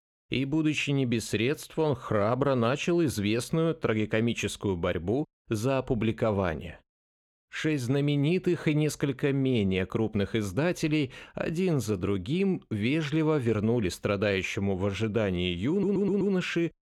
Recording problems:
audio stuttering; at 16 s

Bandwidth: 18.5 kHz